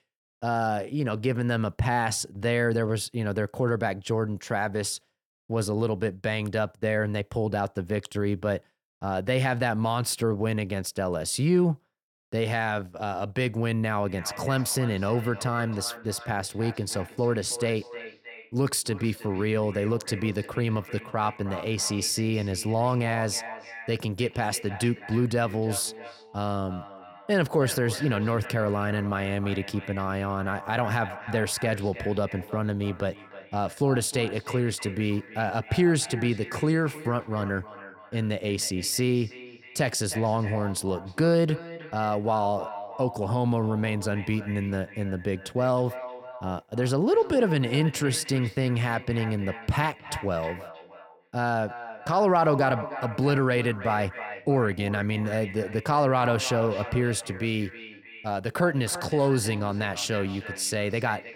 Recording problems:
echo of what is said; noticeable; from 14 s on; 310 ms later, 15 dB below the speech

